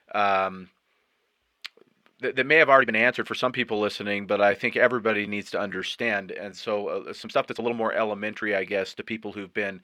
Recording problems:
thin; somewhat; fading below 550 Hz
muffled; very slightly; fading above 3.5 kHz
uneven, jittery; strongly; from 2 to 9 s

